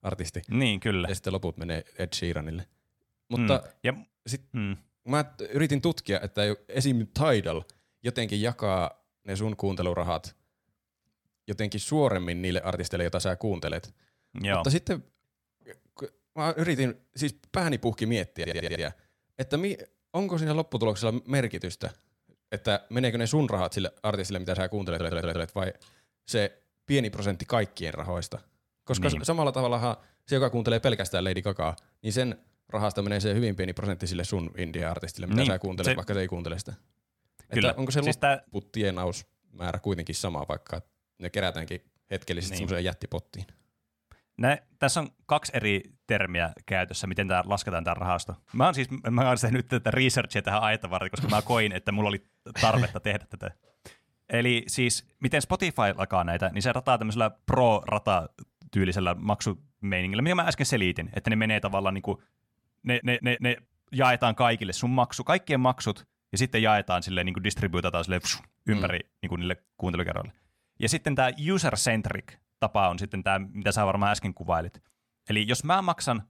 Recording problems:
audio stuttering; at 18 s, at 25 s and at 1:03

